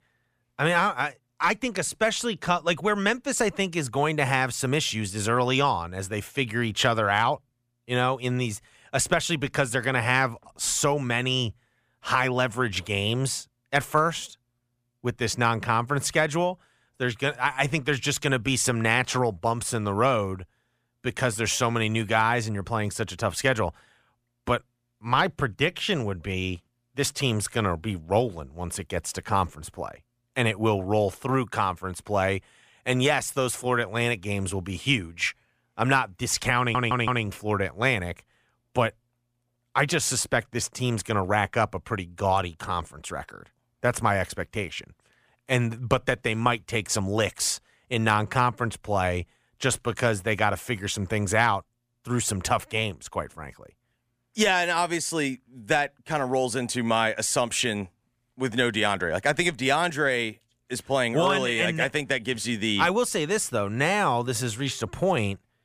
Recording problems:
audio stuttering; at 37 s

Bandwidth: 15 kHz